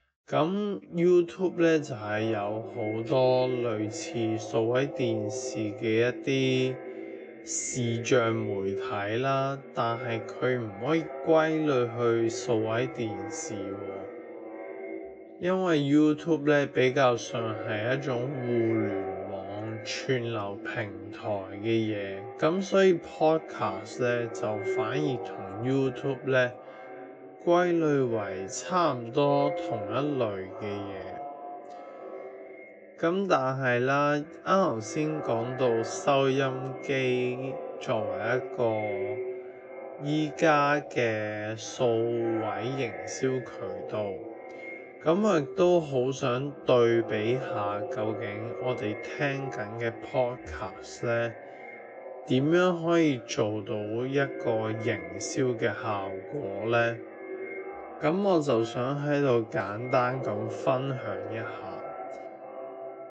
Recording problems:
echo of what is said; strong; throughout; 560 ms later, 10 dB below the speech
wrong speed, natural pitch; too slow; 0.6 times normal speed
high frequencies cut off; noticeable; nothing above 8 kHz

